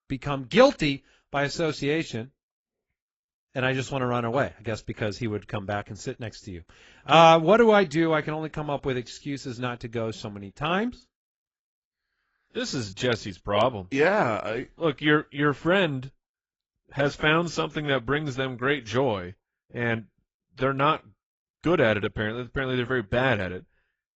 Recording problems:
garbled, watery; badly; nothing above 7.5 kHz

